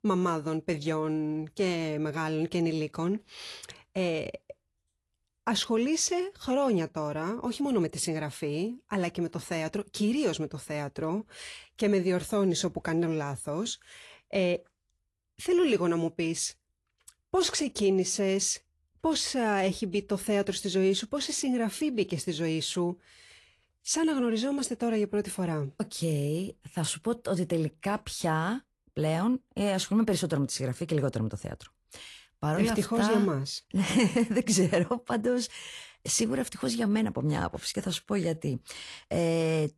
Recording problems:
garbled, watery; slightly; nothing above 11.5 kHz

